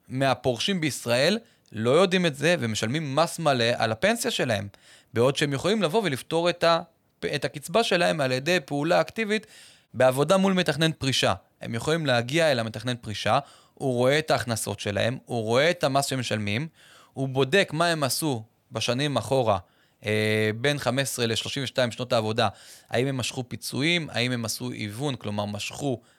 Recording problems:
none

